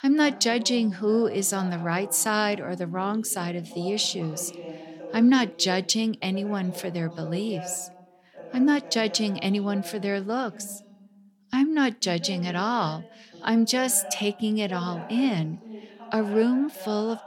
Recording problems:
voice in the background; noticeable; throughout; 15 dB below the speech

